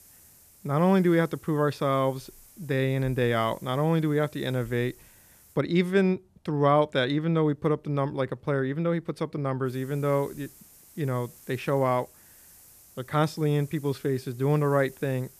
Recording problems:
hiss; faint; until 5.5 s and from 9.5 s on; 25 dB below the speech

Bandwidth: 14.5 kHz